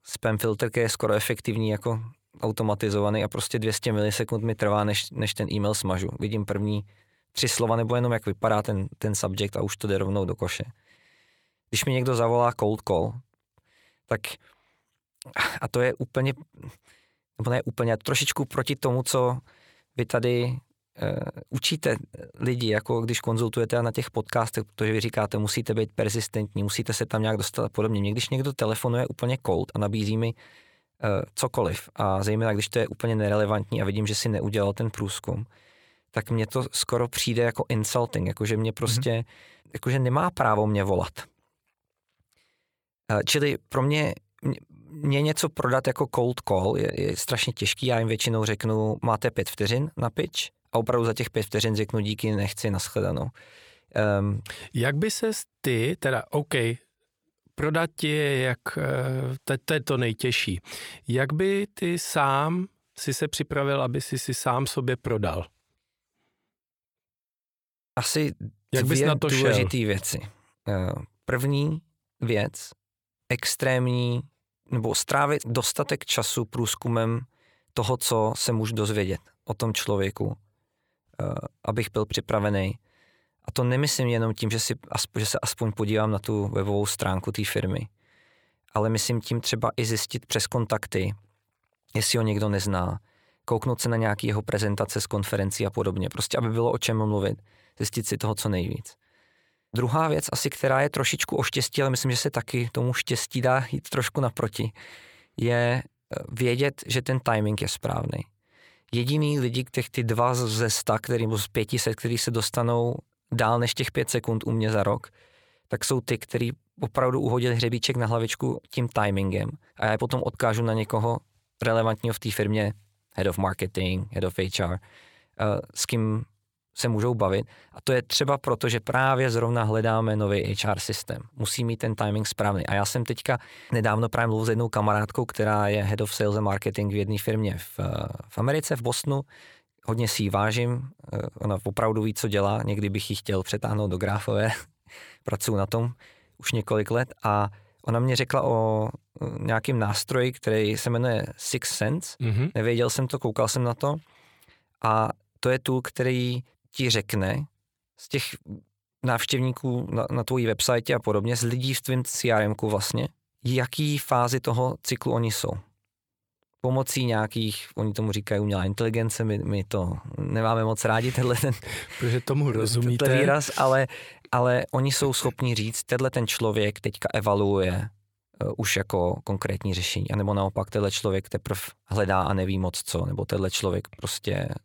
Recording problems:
none

